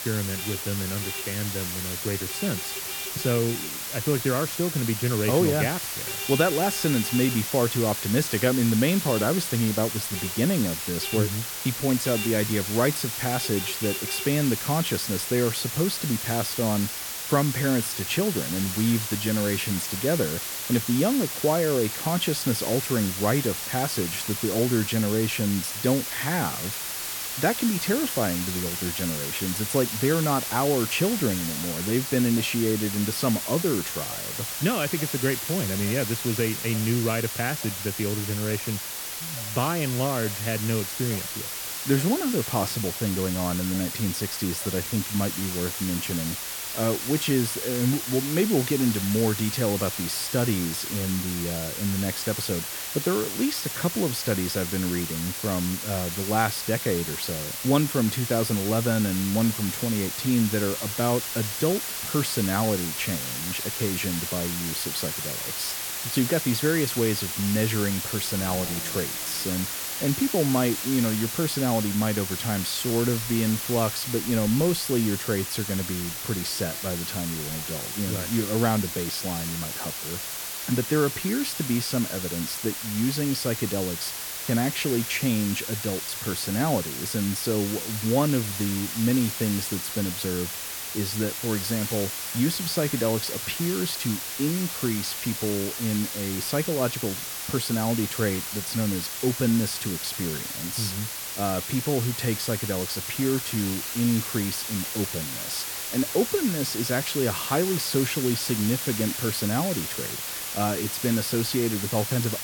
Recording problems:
hiss; loud; throughout; 3 dB below the speech
traffic noise; noticeable; throughout; 15 dB below the speech

